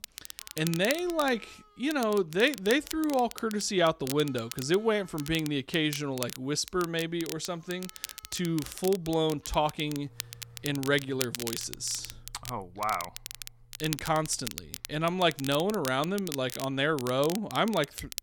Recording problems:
crackle, like an old record; noticeable; 10 dB below the speech
background music; faint; throughout; 30 dB below the speech

